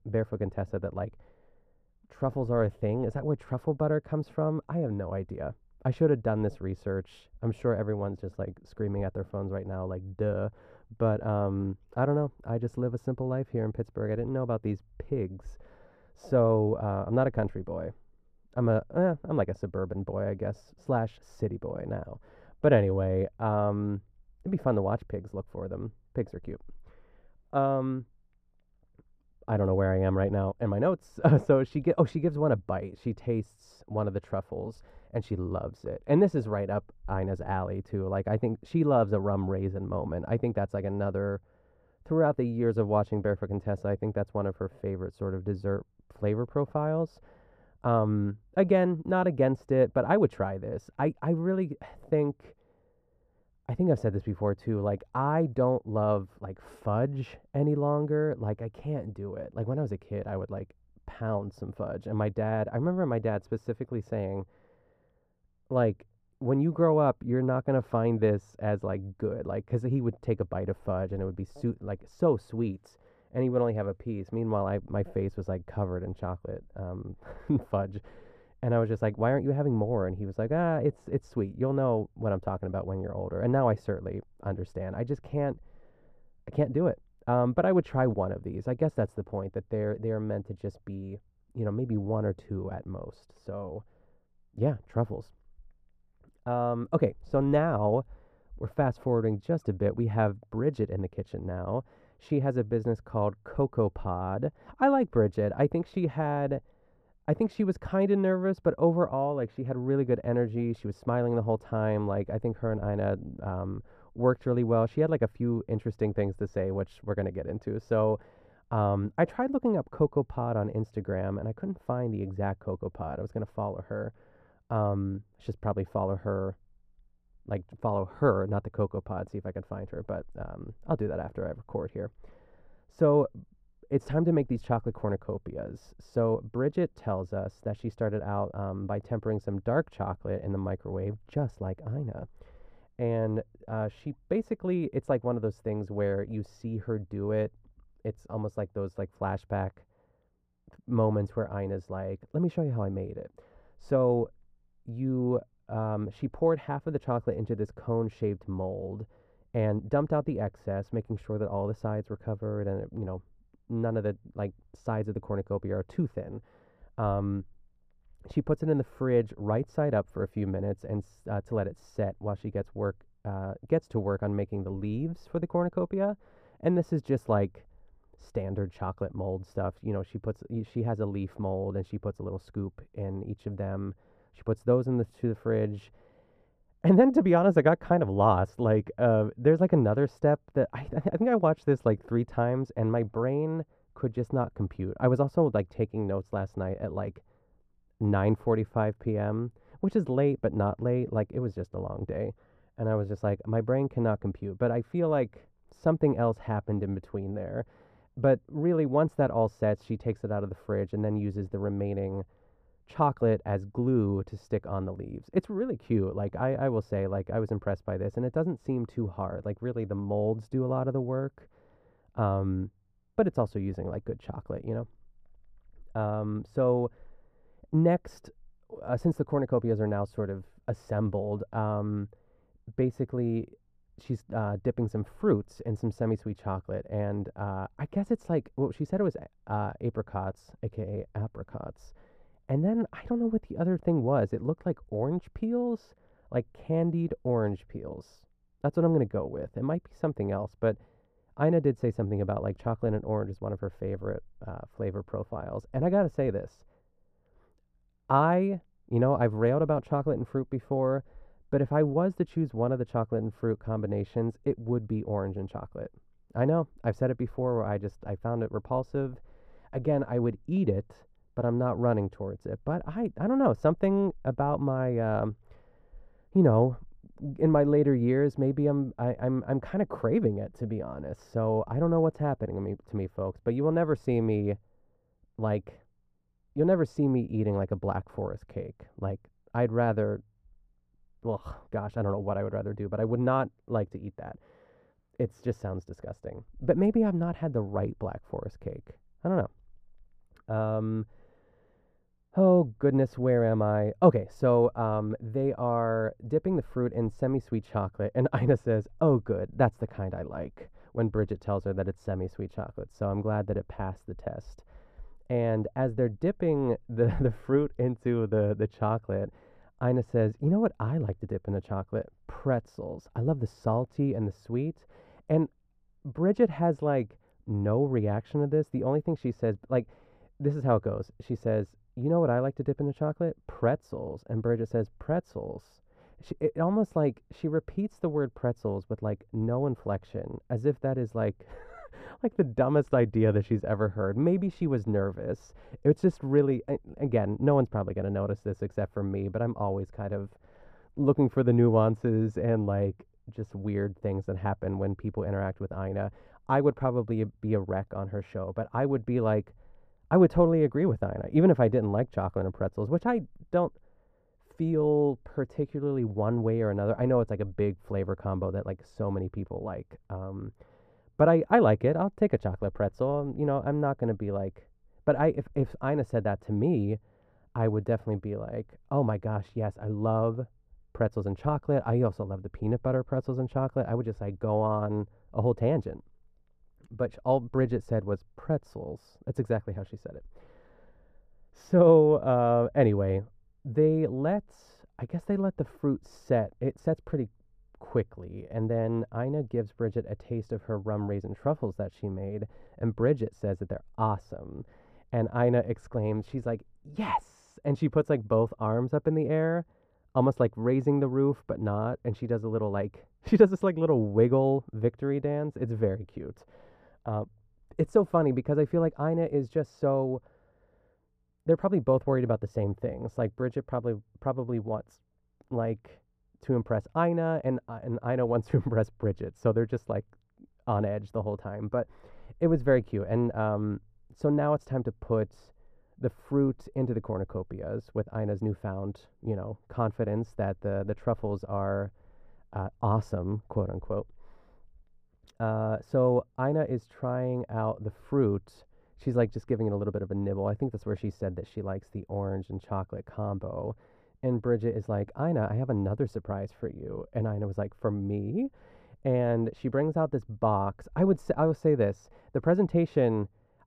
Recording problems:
muffled; very; fading above 1.5 kHz

